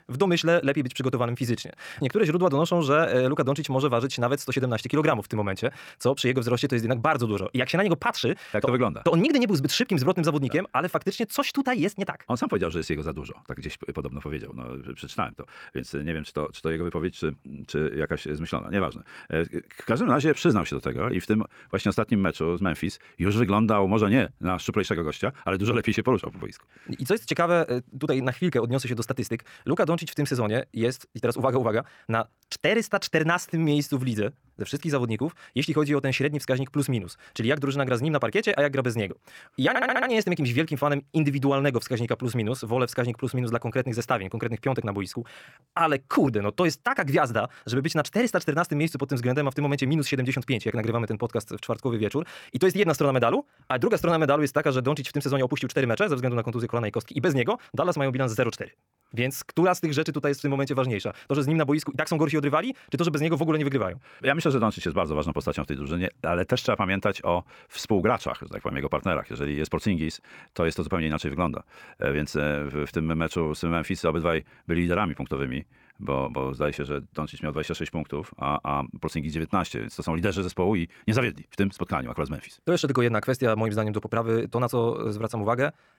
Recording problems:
wrong speed, natural pitch; too fast; 1.5 times normal speed
audio stuttering; at 40 s

